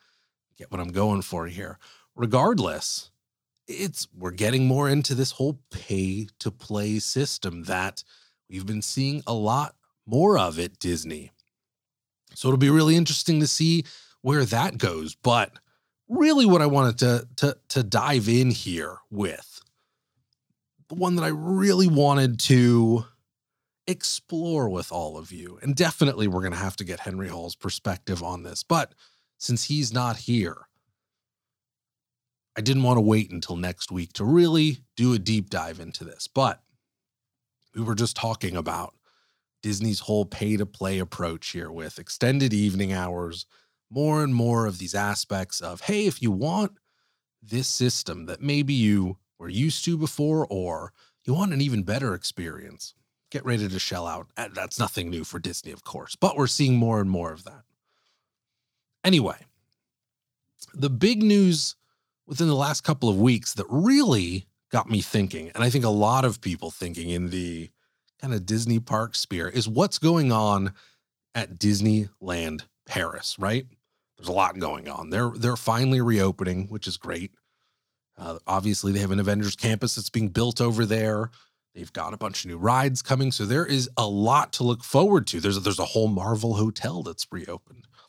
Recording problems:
none

